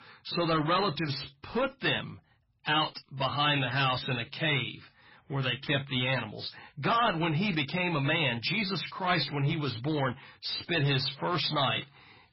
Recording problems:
distortion; heavy; 9% of the sound clipped
garbled, watery; badly; nothing above 5.5 kHz

